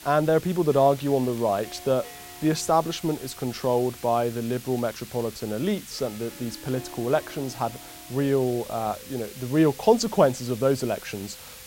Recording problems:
hiss; noticeable; throughout; 15 dB below the speech
background music; faint; throughout; 25 dB below the speech
crackling; very faint; at 0.5 s and from 4.5 to 8.5 s; 30 dB below the speech

